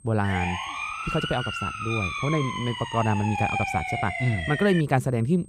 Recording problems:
high-pitched whine; faint; throughout; 8.5 kHz, 25 dB below the speech
siren; loud; until 5 s; peak level with the speech

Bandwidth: 15 kHz